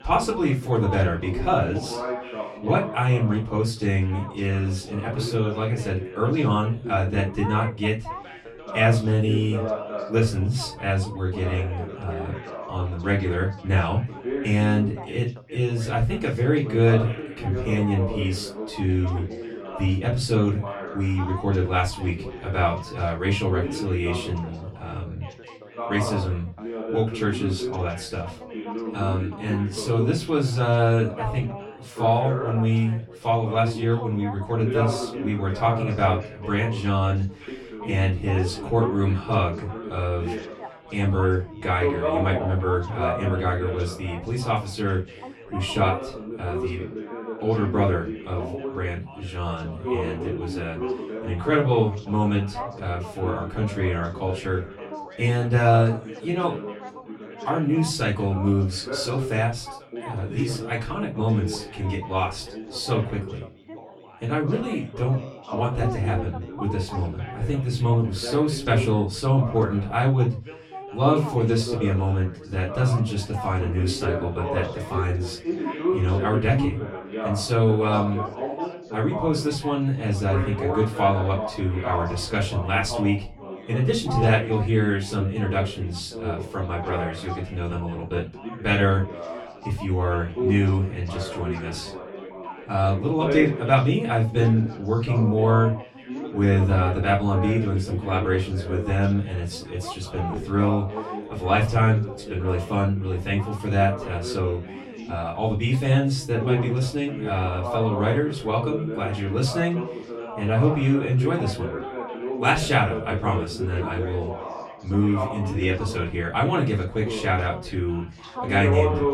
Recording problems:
off-mic speech; far
room echo; very slight; dies away in 0.2 s
background chatter; loud; throughout; 4 voices, 9 dB below the speech

